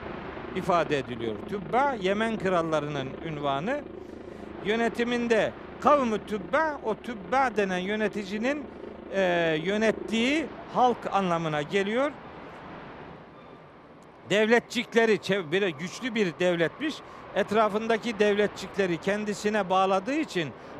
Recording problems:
train or aircraft noise; noticeable; throughout; 15 dB below the speech

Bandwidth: 14.5 kHz